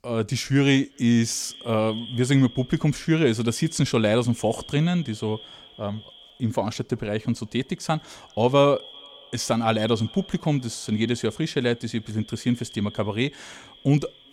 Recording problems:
echo of what is said; faint; throughout; 390 ms later, 20 dB below the speech

